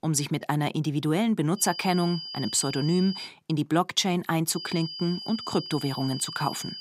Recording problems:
high-pitched whine; loud; from 1.5 to 3.5 s and from 4.5 s on; 5 kHz, 9 dB below the speech

